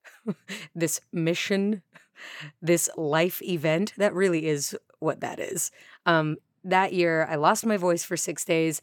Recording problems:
none

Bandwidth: 18 kHz